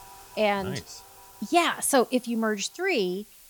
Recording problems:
household noises; faint; throughout; 25 dB below the speech
hiss; faint; throughout; 25 dB below the speech

